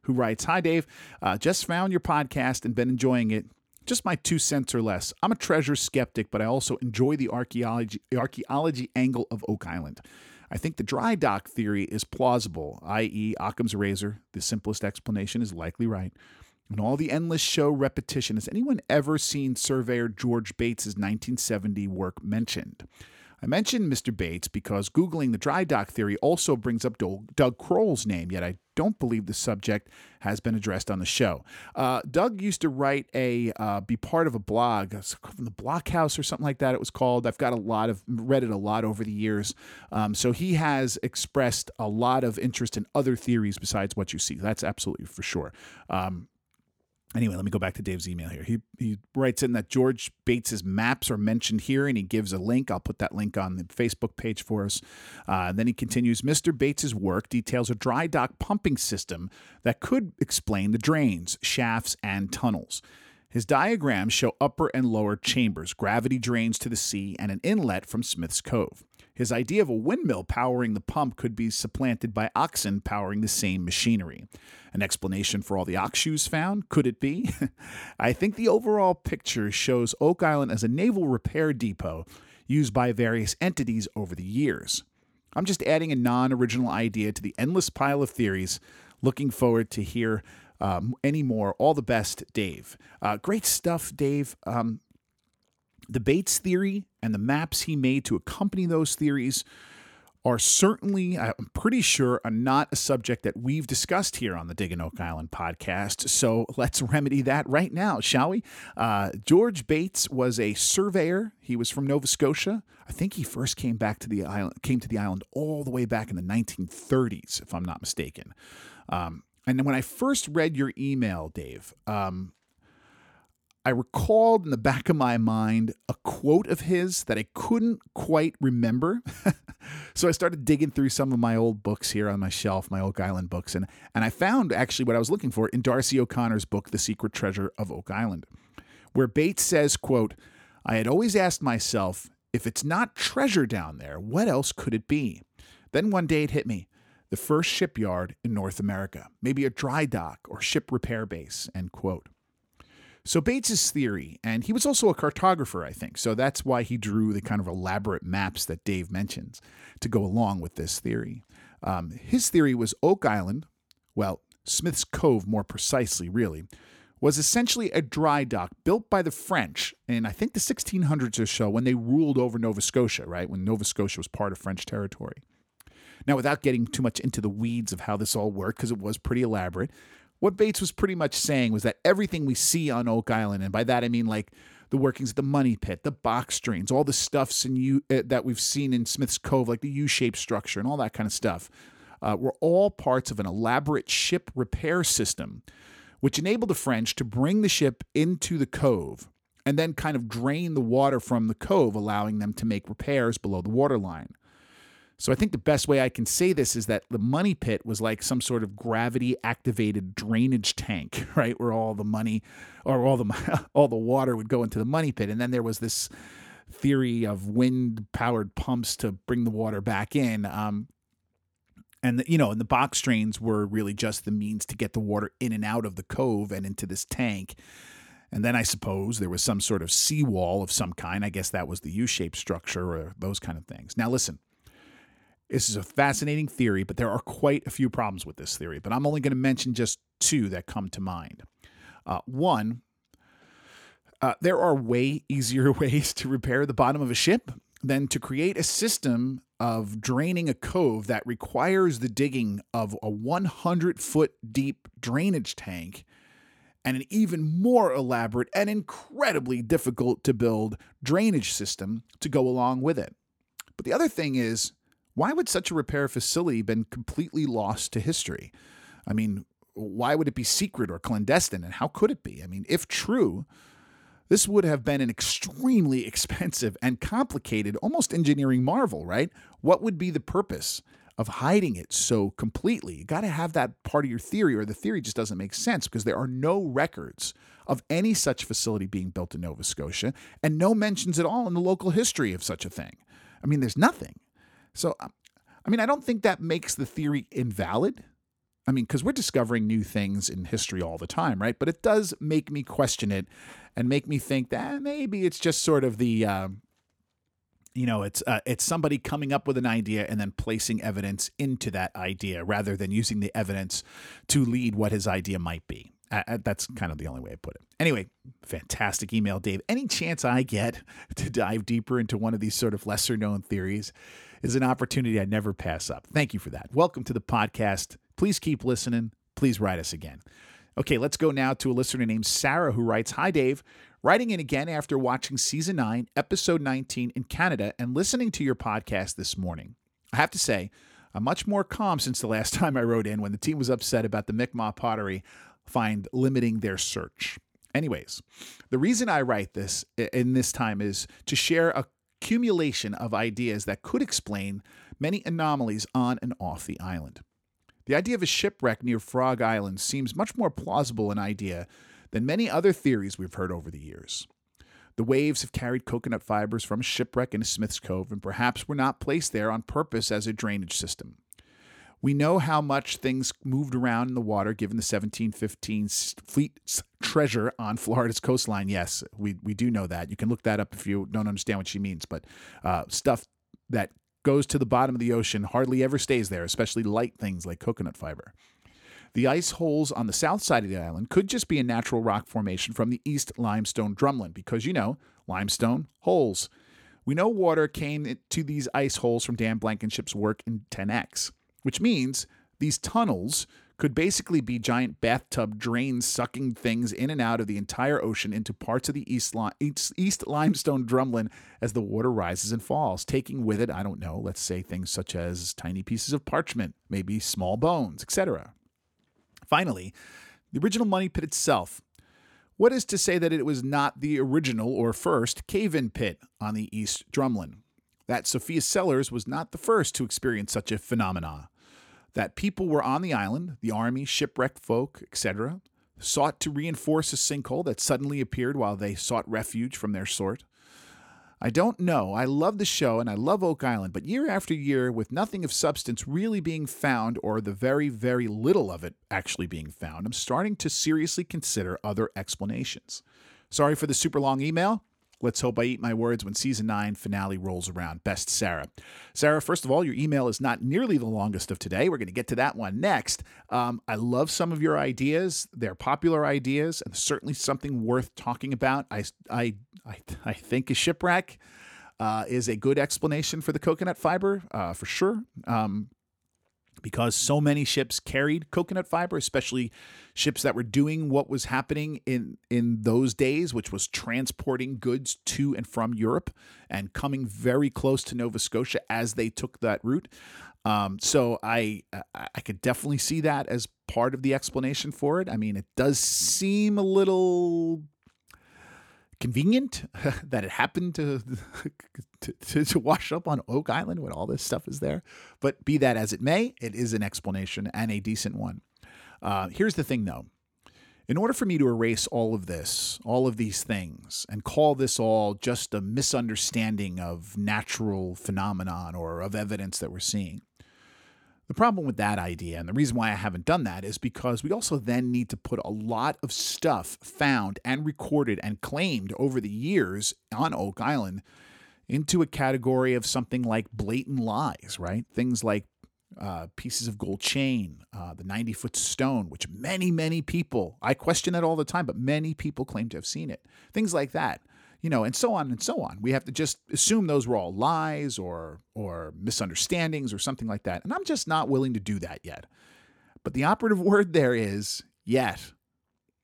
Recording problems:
none

